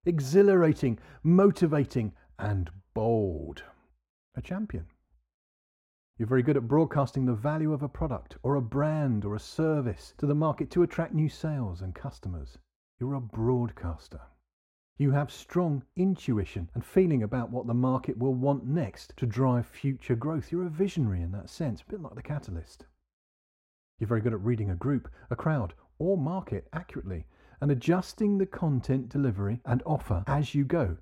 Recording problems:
muffled; very; fading above 3 kHz

